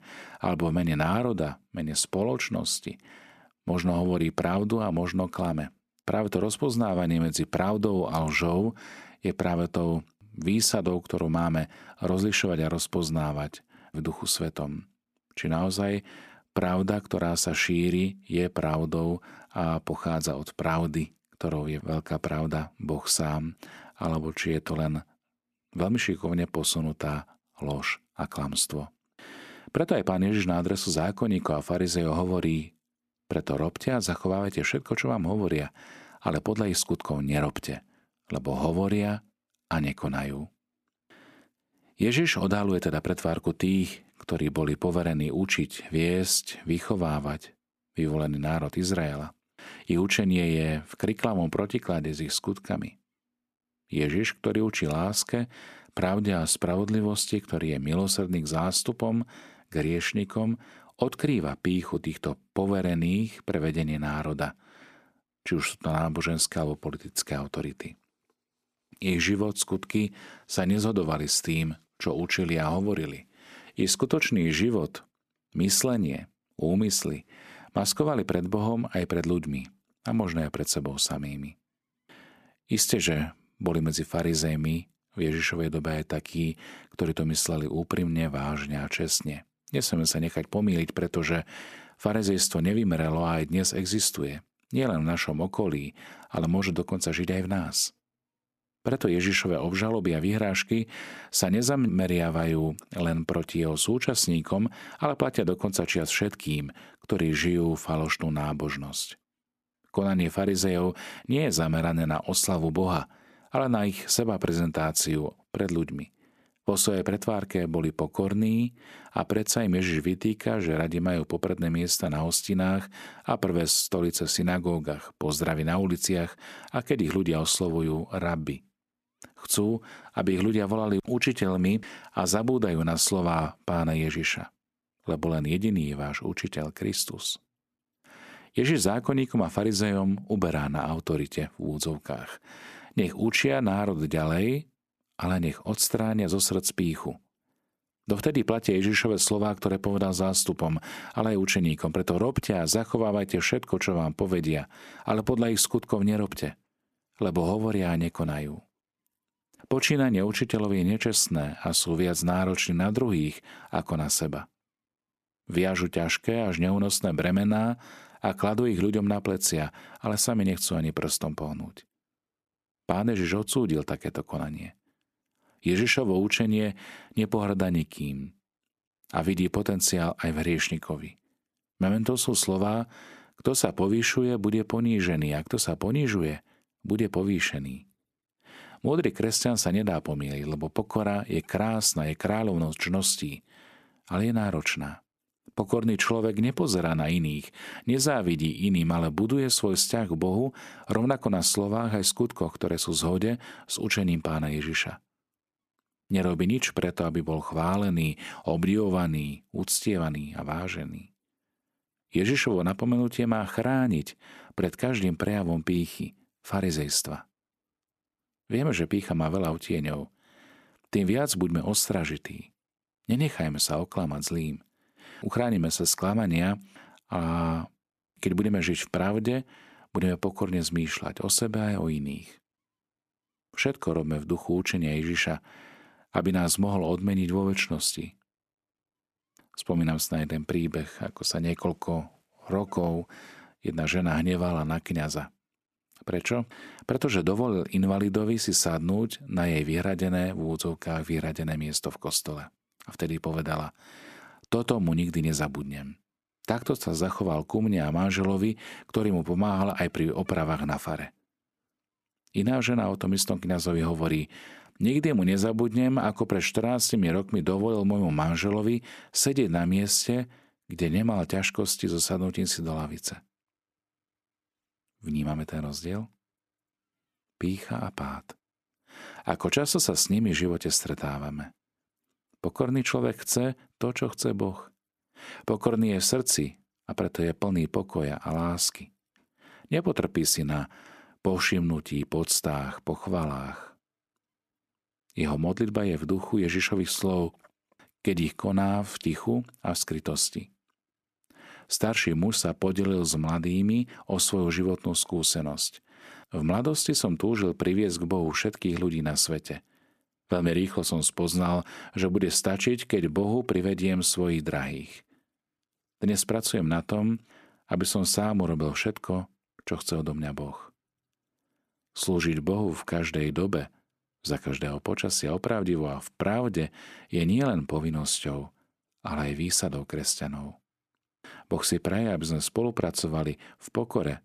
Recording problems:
none

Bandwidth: 14.5 kHz